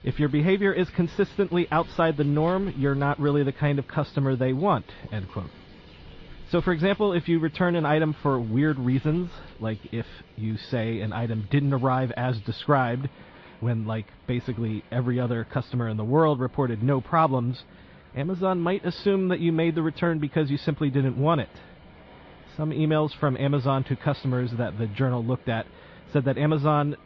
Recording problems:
muffled; slightly; fading above 4 kHz
garbled, watery; slightly
rain or running water; faint; throughout; 25 dB below the speech

